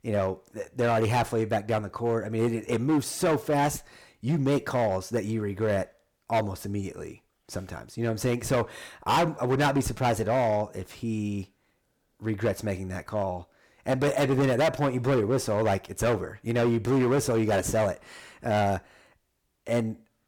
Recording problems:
distortion; heavy; 9% of the sound clipped

